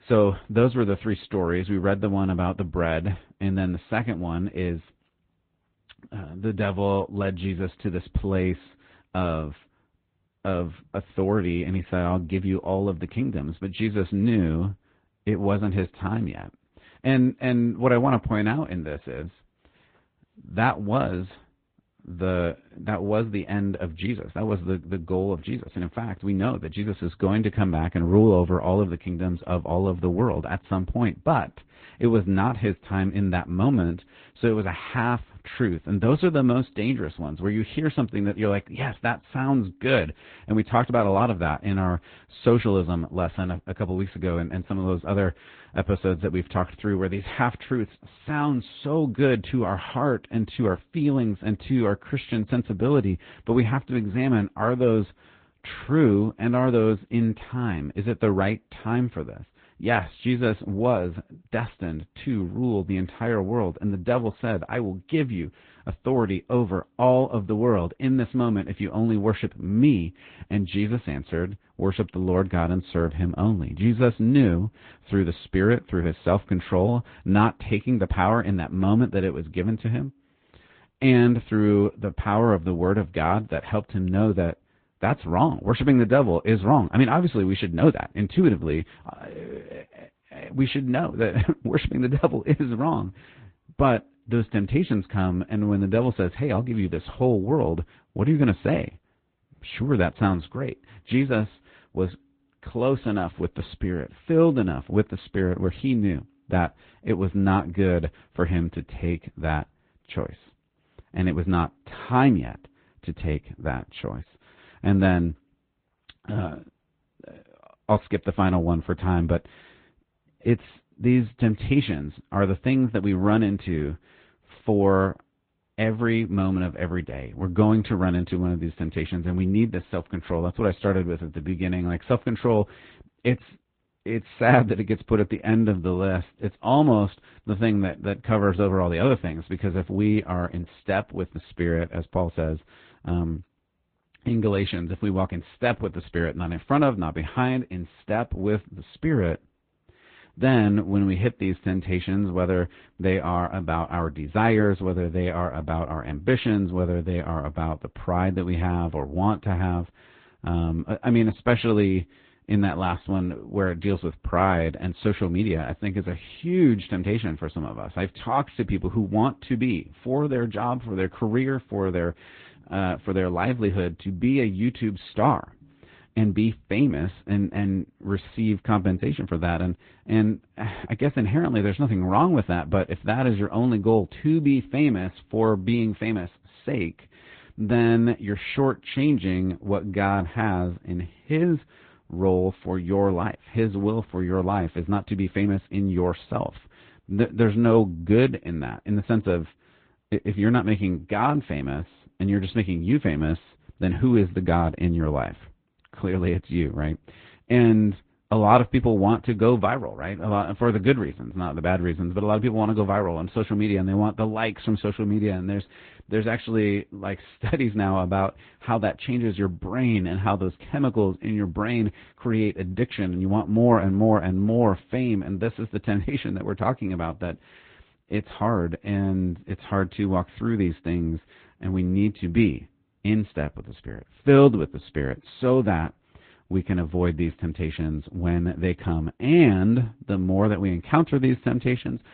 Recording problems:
high frequencies cut off; severe; nothing above 4 kHz
garbled, watery; slightly

